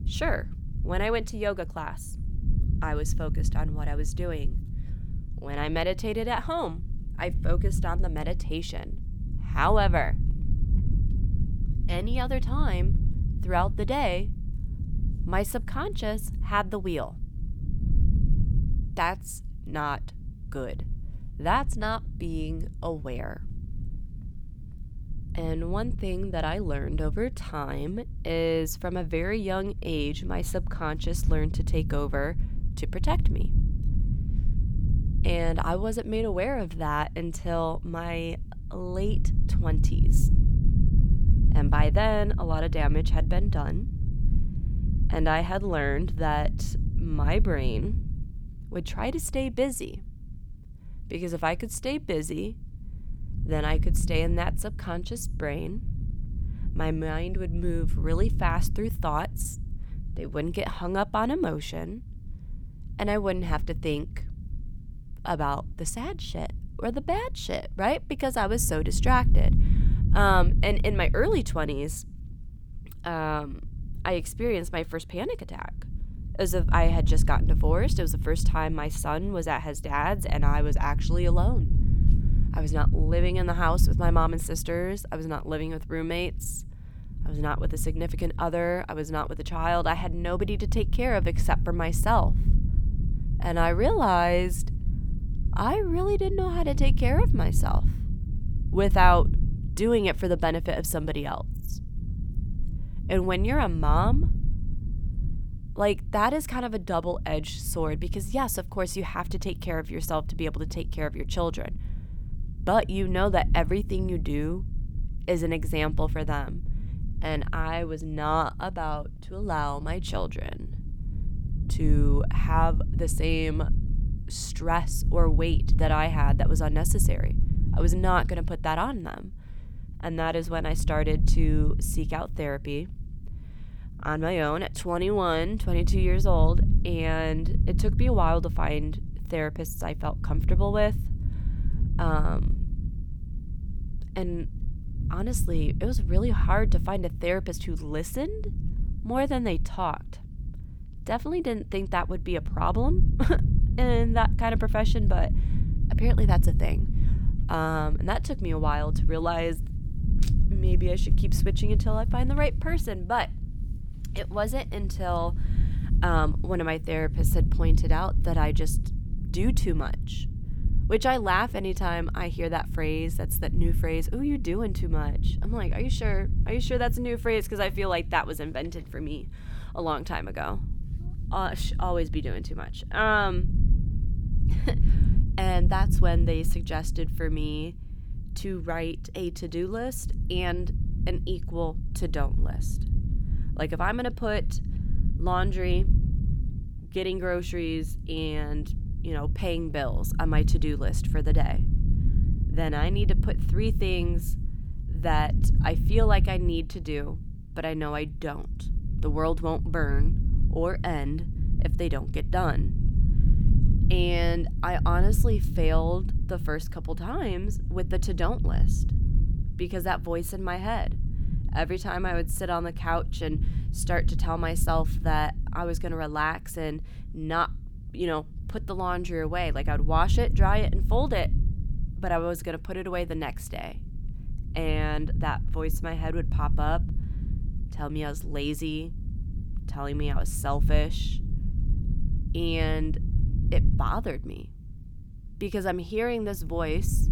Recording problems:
low rumble; noticeable; throughout; 15 dB below the speech

